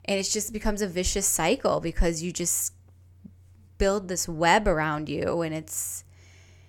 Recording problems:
none

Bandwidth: 17 kHz